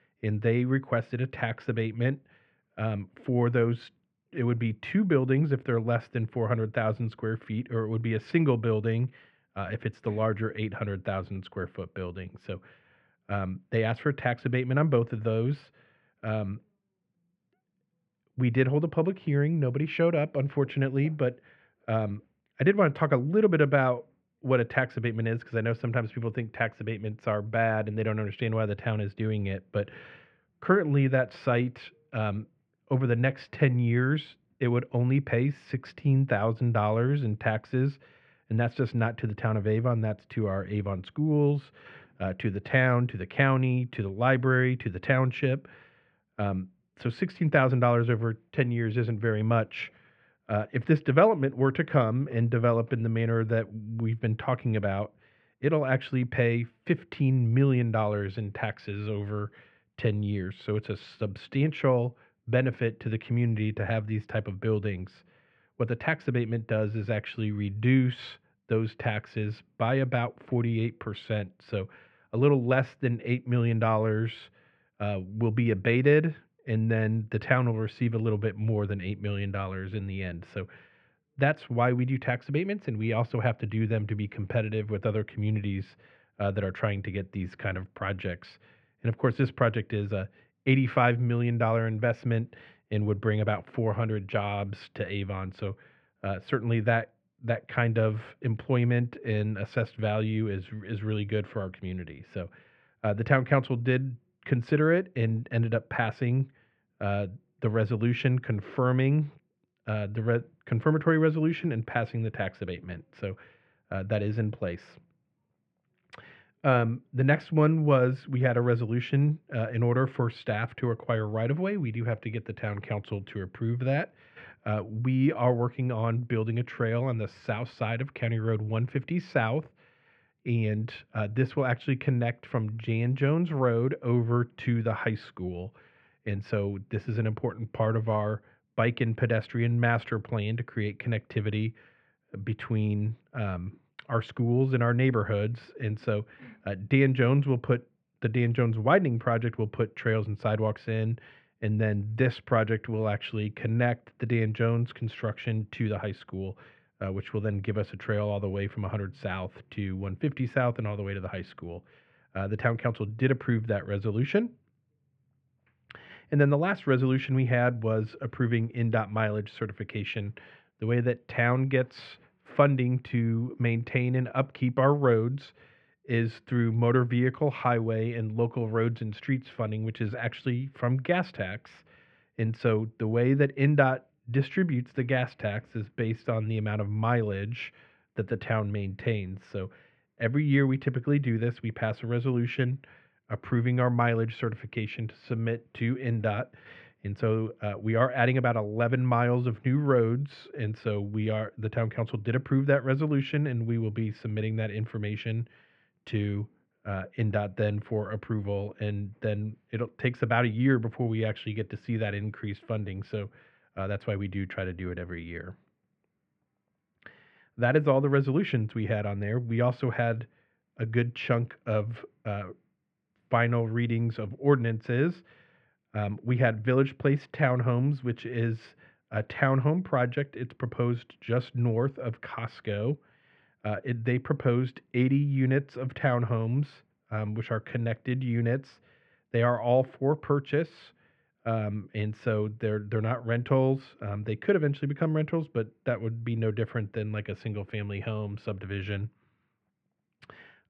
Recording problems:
muffled; very; fading above 2.5 kHz

